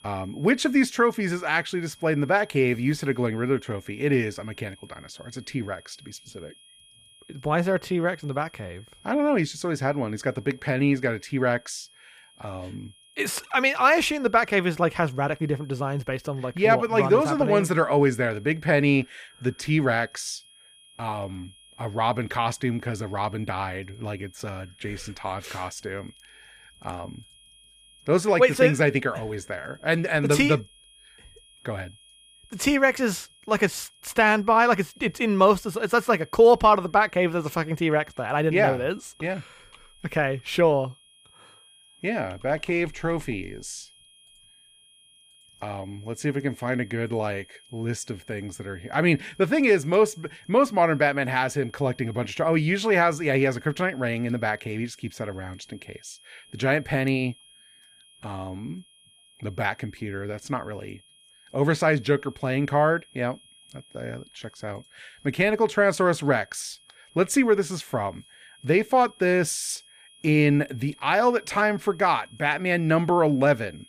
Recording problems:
high-pitched whine; faint; throughout; 3.5 kHz, 30 dB below the speech

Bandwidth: 15 kHz